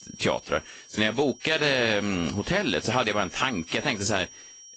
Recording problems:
garbled, watery; slightly; nothing above 8 kHz
high-pitched whine; noticeable; throughout; 5.5 kHz, 20 dB below the speech

